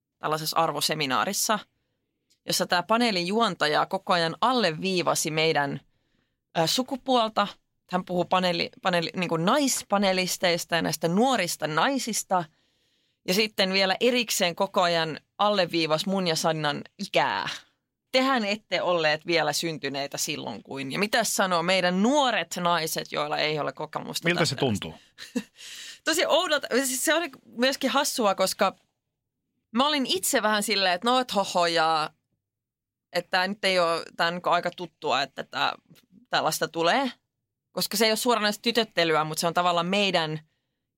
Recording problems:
none

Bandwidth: 16 kHz